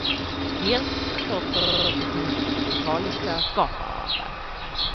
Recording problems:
echo of what is said; noticeable; throughout; 150 ms later, 15 dB below the speech
high frequencies cut off; noticeable; nothing above 5.5 kHz
animal sounds; very loud; throughout; 2 dB above the speech
household noises; very loud; throughout; 1 dB above the speech
audio stuttering; 4 times, first at 1 s

